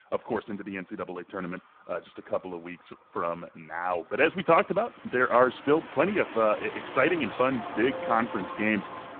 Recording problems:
phone-call audio; poor line
traffic noise; noticeable; throughout; 10 dB below the speech

